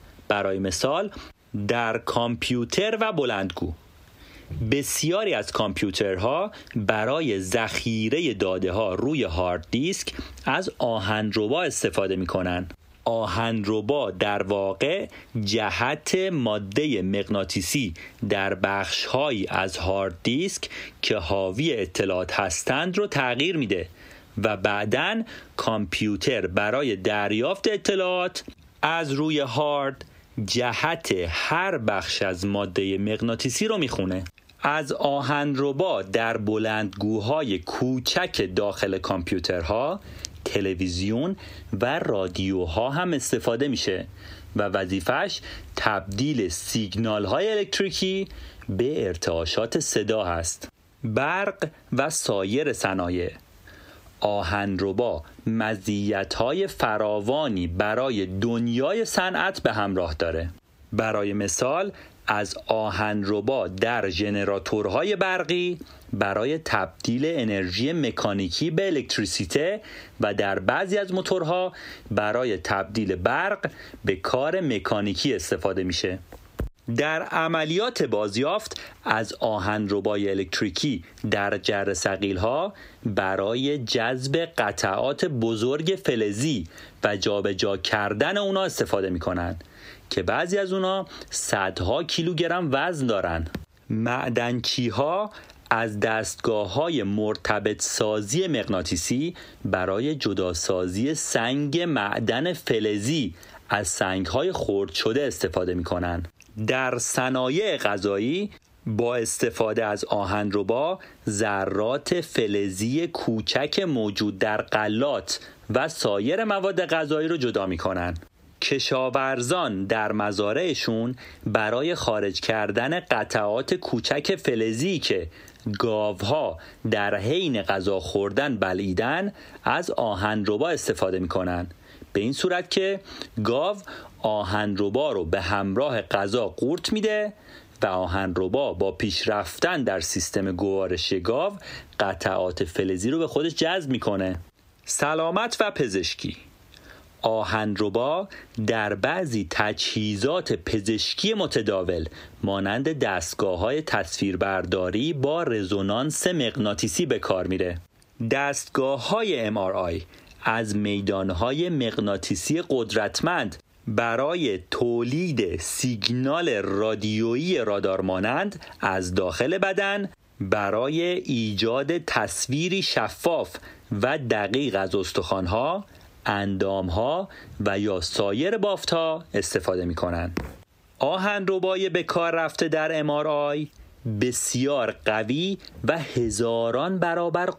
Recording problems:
squashed, flat; heavily

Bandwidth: 15.5 kHz